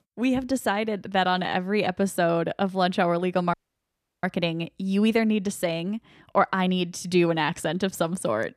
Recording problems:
audio cutting out; at 3.5 s for 0.5 s

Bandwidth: 14.5 kHz